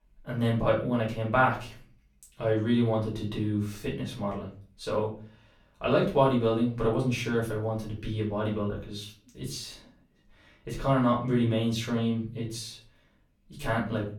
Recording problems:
off-mic speech; far
room echo; slight; dies away in 0.4 s

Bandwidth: 19 kHz